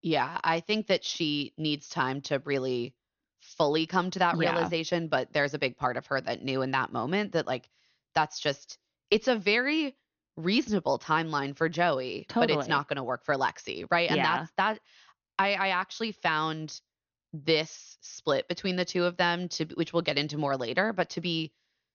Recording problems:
high frequencies cut off; noticeable; nothing above 6.5 kHz

